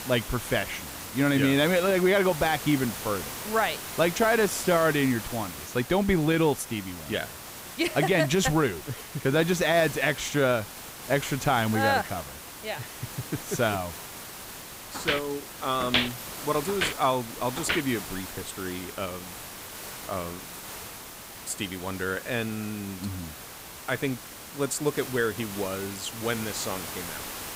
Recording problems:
hiss; noticeable; throughout; 10 dB below the speech
footsteps; loud; from 15 to 18 s; peak 2 dB above the speech

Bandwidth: 15.5 kHz